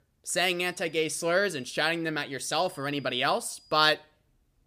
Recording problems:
high-pitched whine; faint; at 0.5 s and from 2.5 to 4 s; 5 kHz, 30 dB below the speech

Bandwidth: 15 kHz